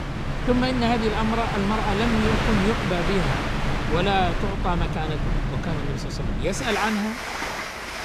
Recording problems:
train or aircraft noise; loud; throughout; 1 dB below the speech

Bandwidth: 15 kHz